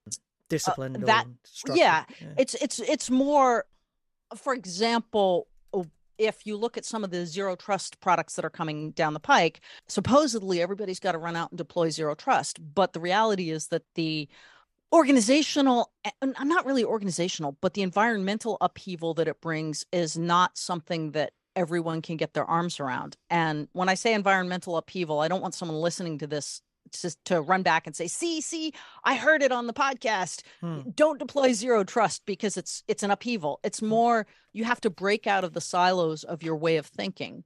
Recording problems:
none

